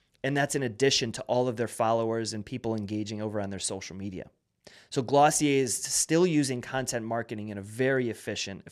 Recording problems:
none

